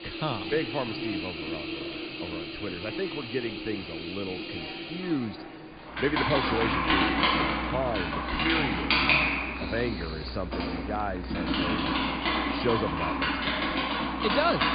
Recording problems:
high frequencies cut off; severe; nothing above 5 kHz
household noises; very loud; throughout; 4 dB above the speech
murmuring crowd; noticeable; throughout; 10 dB below the speech

